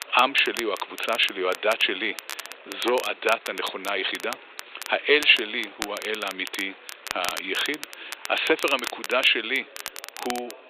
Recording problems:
thin; very; fading below 350 Hz
high frequencies cut off; severe; nothing above 4 kHz
crackle, like an old record; noticeable; 15 dB below the speech
murmuring crowd; faint; throughout; 20 dB below the speech

